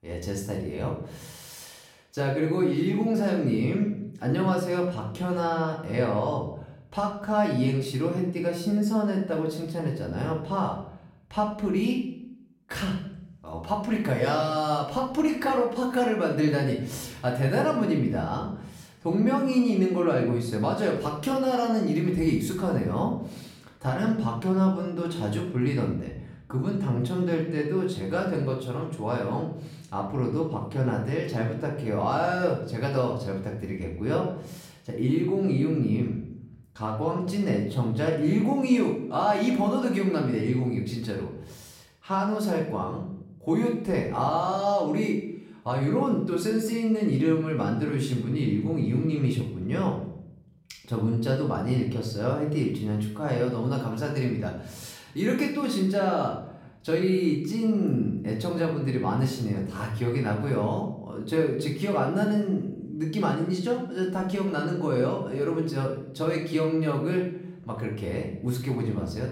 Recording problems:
off-mic speech; far
room echo; noticeable; dies away in 0.6 s

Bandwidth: 16.5 kHz